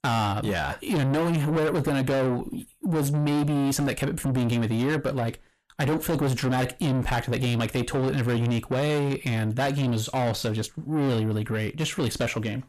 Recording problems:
distortion; heavy; 7 dB below the speech

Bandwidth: 14 kHz